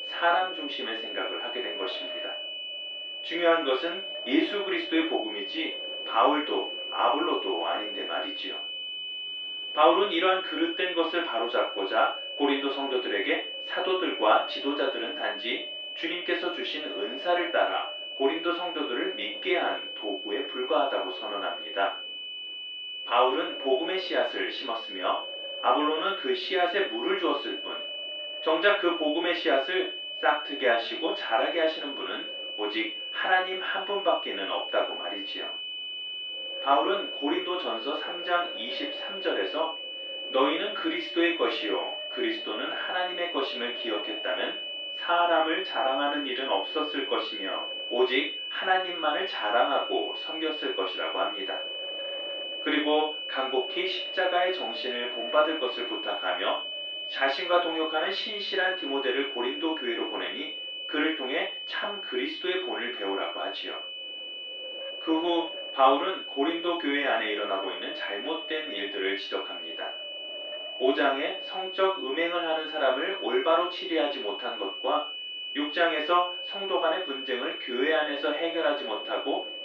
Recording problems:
off-mic speech; far
room echo; noticeable; dies away in 0.3 s
muffled; slightly; fading above 2.5 kHz
thin; somewhat; fading below 350 Hz
high-pitched whine; loud; throughout; 3 kHz, 5 dB below the speech
wind noise on the microphone; occasional gusts; 20 dB below the speech

